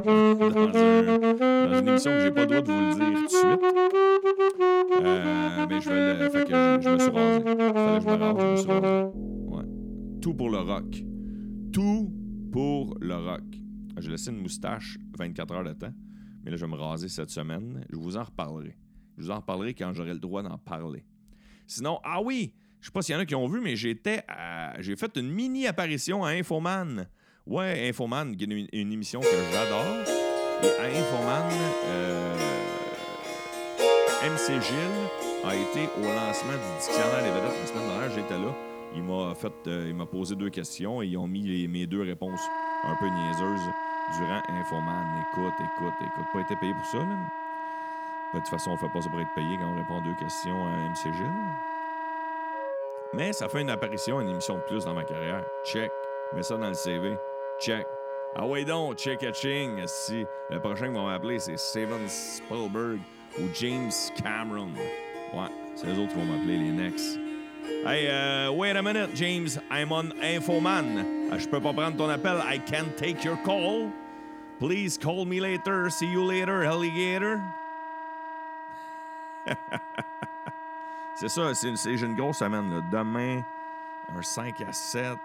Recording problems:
background music; very loud; throughout; 2 dB above the speech

